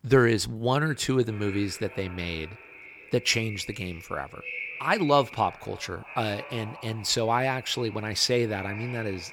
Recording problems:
echo of what is said; noticeable; throughout; 580 ms later, 15 dB below the speech

